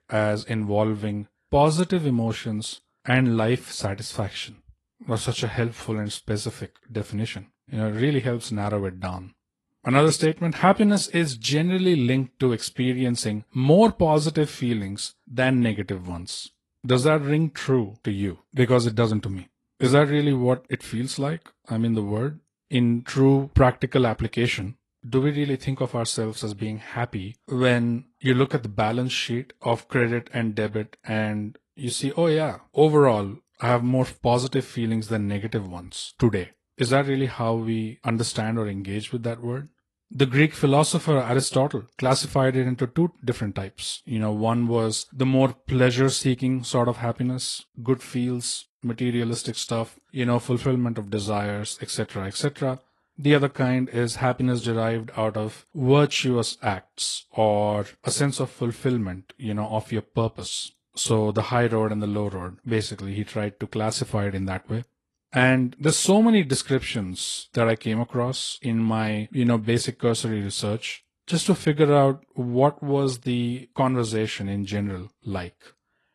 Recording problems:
garbled, watery; slightly

